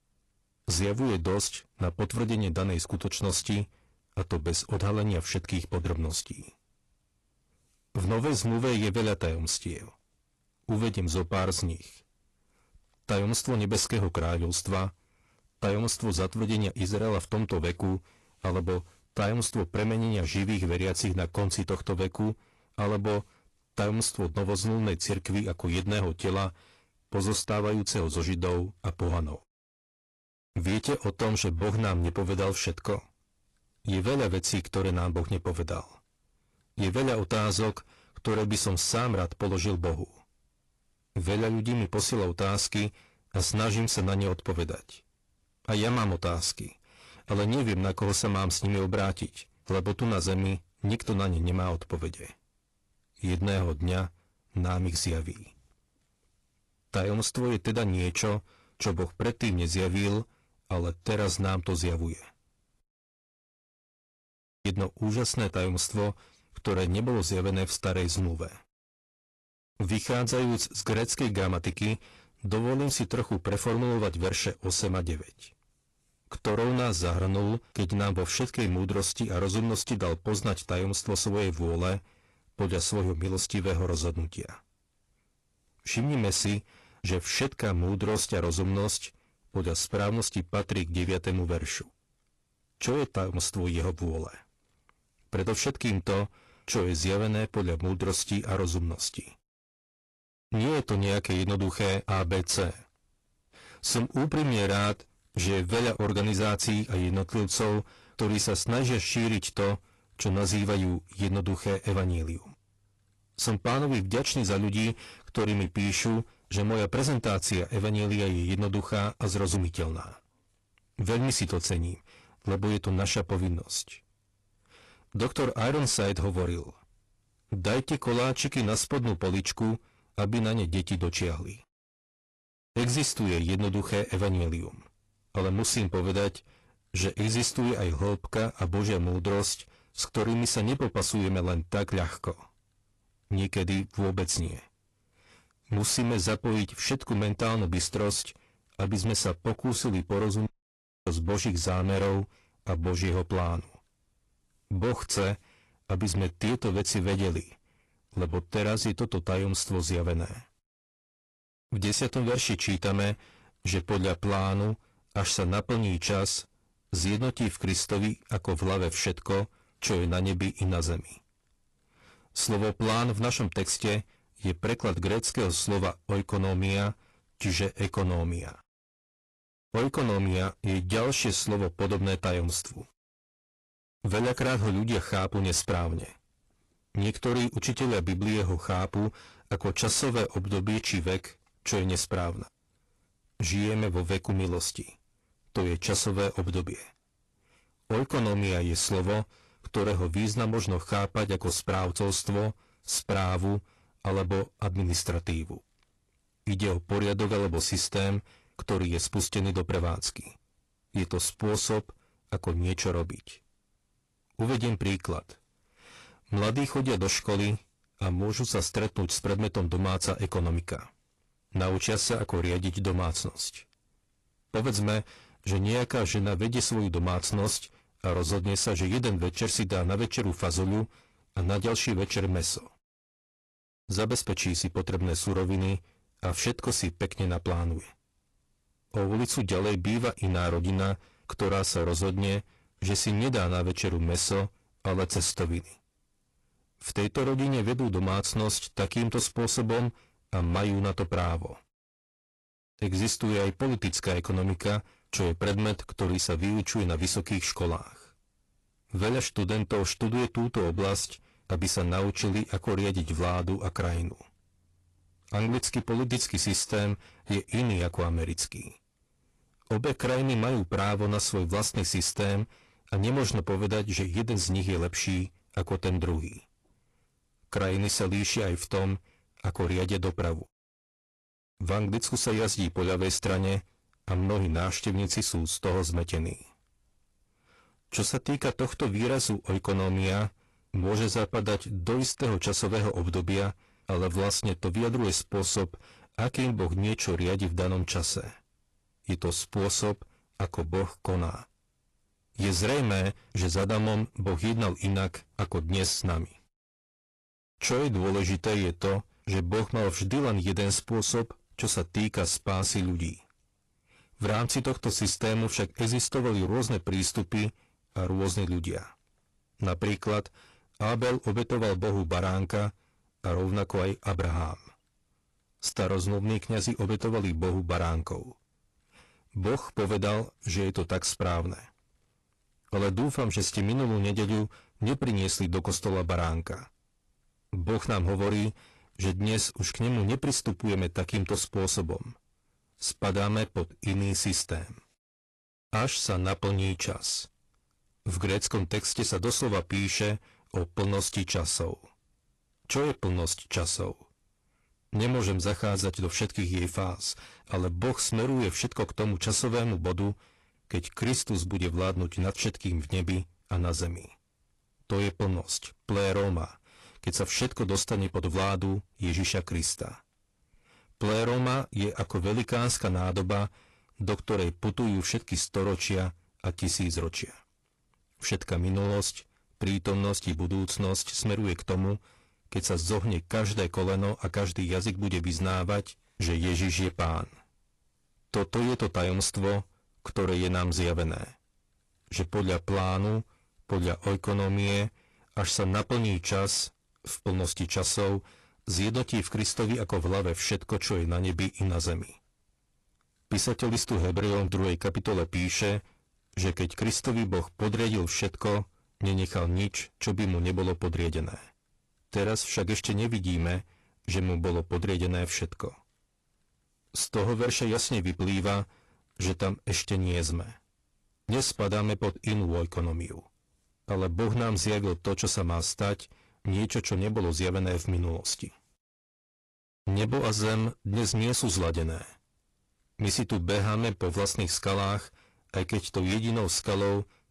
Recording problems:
distortion; heavy; 16% of the sound clipped
garbled, watery; slightly; nothing above 11.5 kHz
audio cutting out; at 1:03 for 2 s and at 2:30 for 0.5 s

